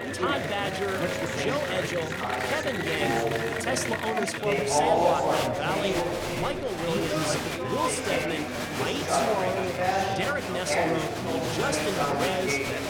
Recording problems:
chatter from many people; very loud; throughout; 4 dB above the speech

